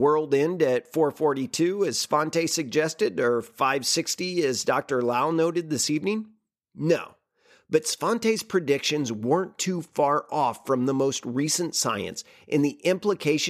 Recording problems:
abrupt cut into speech; at the start and the end

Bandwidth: 14.5 kHz